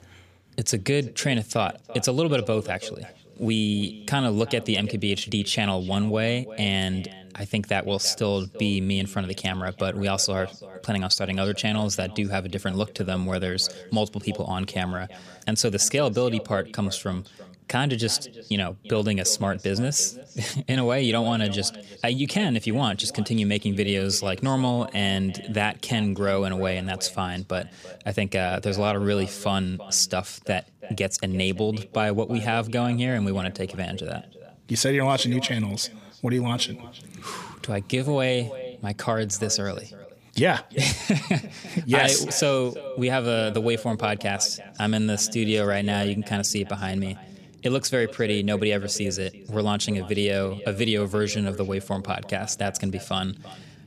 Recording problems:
echo of what is said; noticeable; throughout; 340 ms later, 20 dB below the speech

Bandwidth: 15 kHz